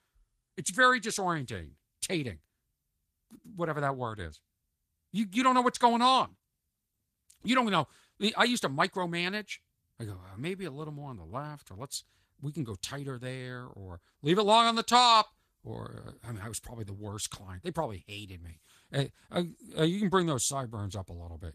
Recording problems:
garbled, watery; slightly; nothing above 14.5 kHz

